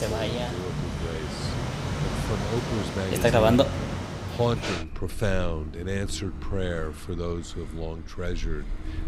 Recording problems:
traffic noise; very loud; throughout; 3 dB above the speech
keyboard typing; faint; until 5.5 s; peak 10 dB below the speech

